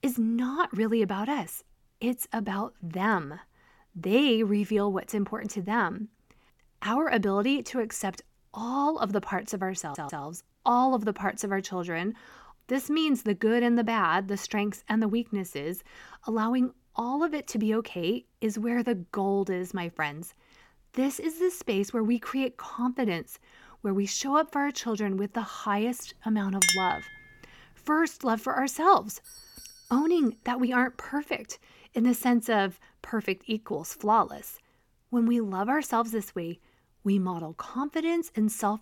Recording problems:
audio stuttering; at 10 s
clattering dishes; loud; at 27 s; peak 5 dB above the speech
doorbell; faint; from 29 to 30 s; peak 20 dB below the speech

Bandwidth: 17 kHz